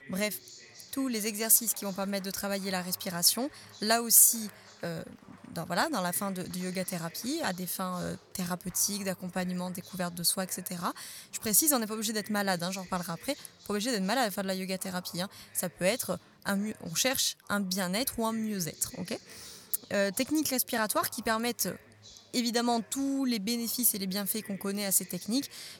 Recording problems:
chatter from many people; faint; throughout; 25 dB below the speech

